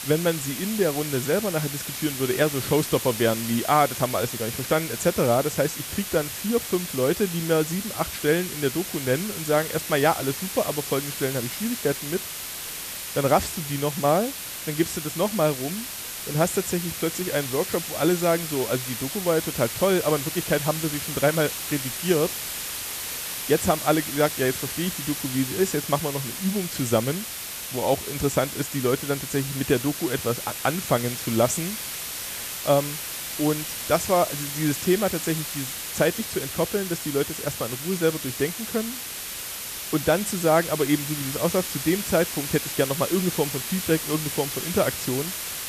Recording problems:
hiss; loud; throughout; 5 dB below the speech

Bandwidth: 14.5 kHz